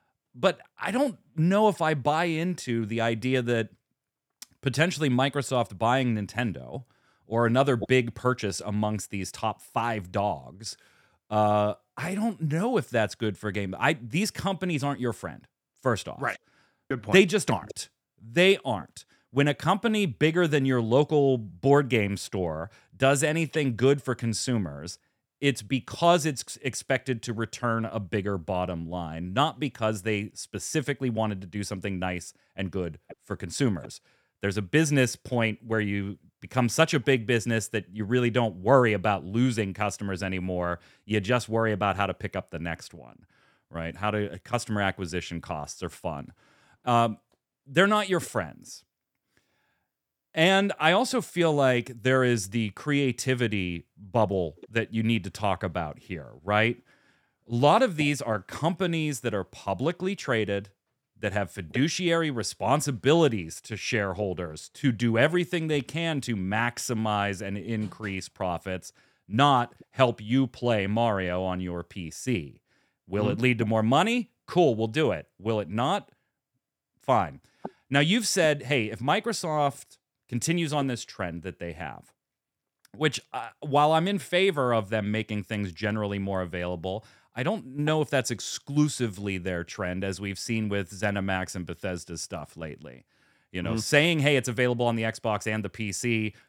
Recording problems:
none

